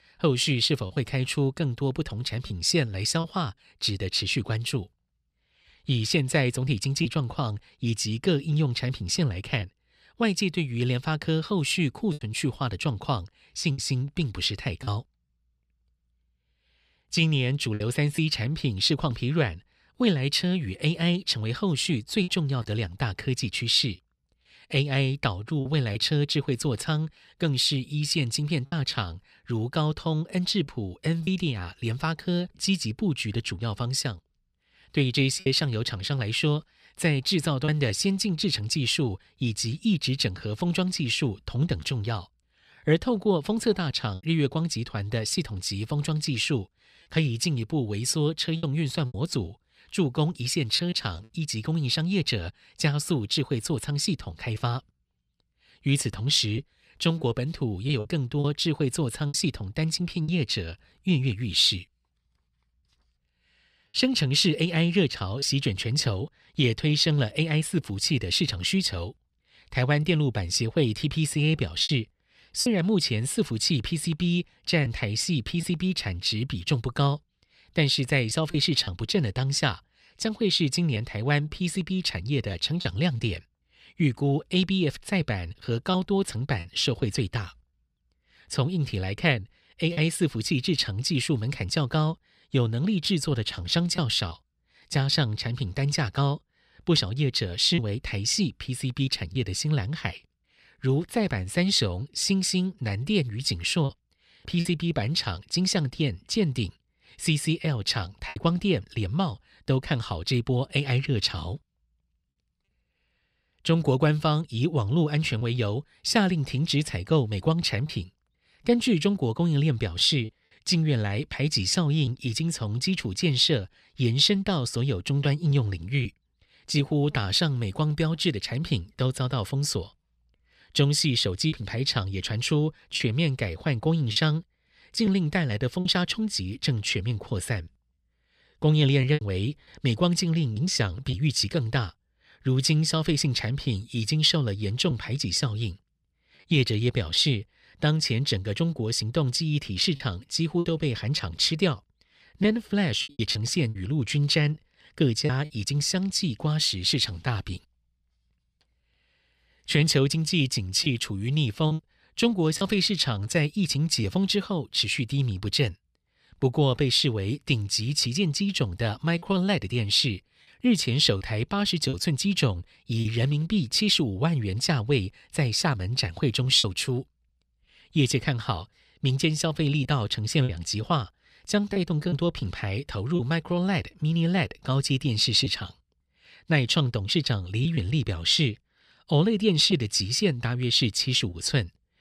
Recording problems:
choppy; occasionally; 2% of the speech affected

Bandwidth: 14.5 kHz